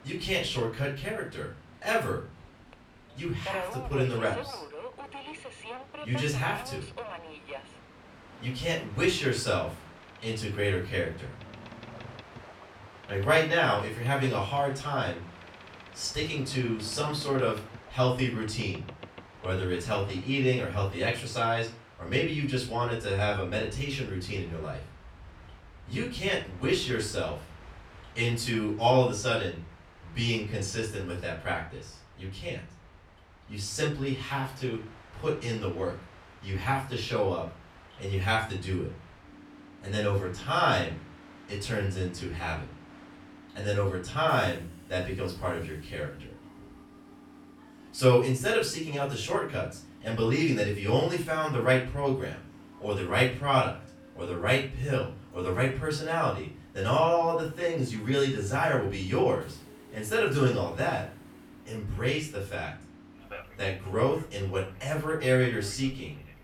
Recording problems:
off-mic speech; far
room echo; slight; dies away in 0.3 s
train or aircraft noise; noticeable; throughout; 20 dB below the speech

